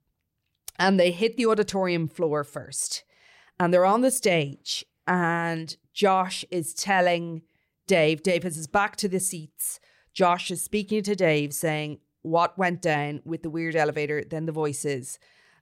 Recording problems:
none

